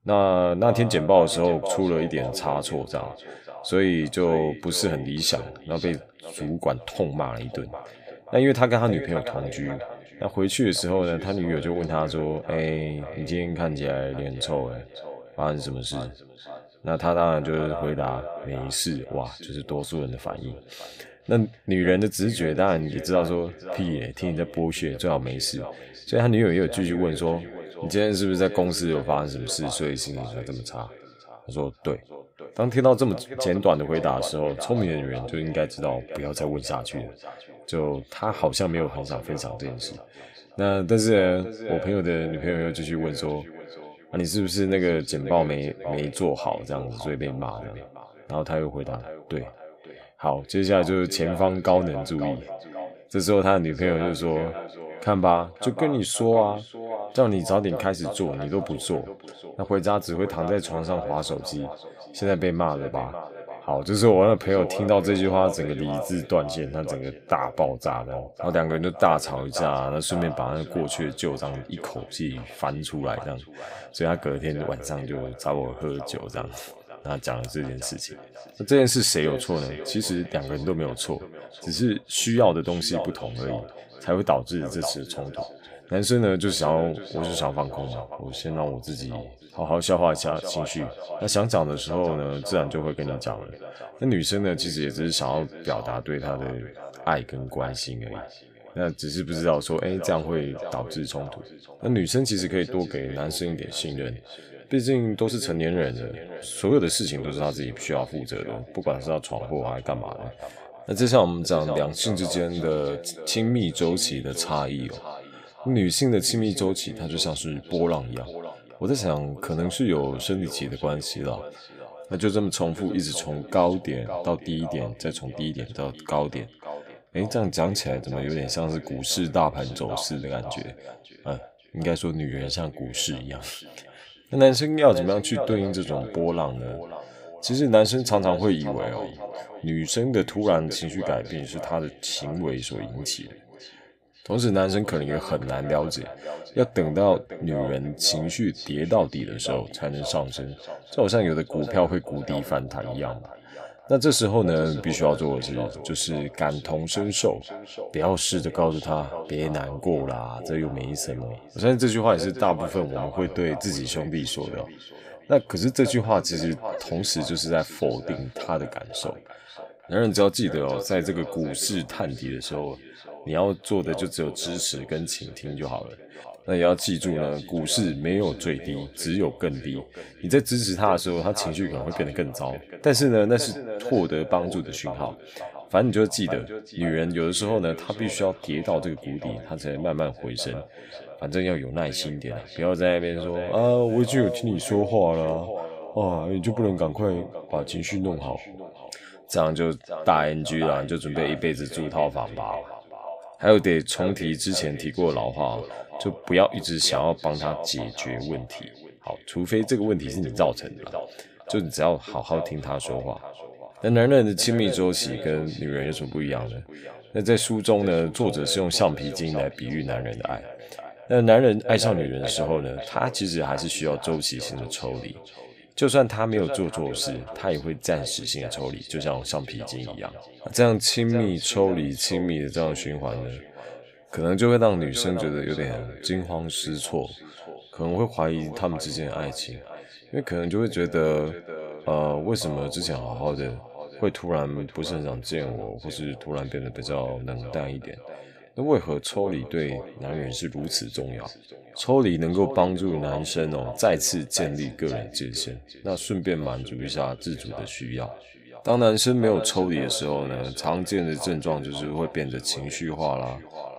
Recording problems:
echo of what is said; noticeable; throughout; 540 ms later, 15 dB below the speech

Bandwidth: 15.5 kHz